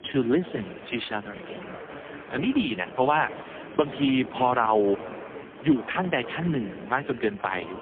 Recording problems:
phone-call audio; poor line
murmuring crowd; noticeable; throughout; 15 dB below the speech

